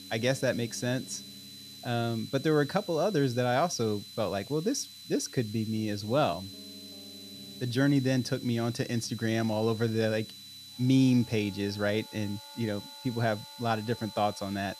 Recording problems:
high-pitched whine; noticeable; throughout; 4 kHz, 15 dB below the speech
background music; faint; throughout; 25 dB below the speech
hiss; faint; throughout; 20 dB below the speech

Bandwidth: 14.5 kHz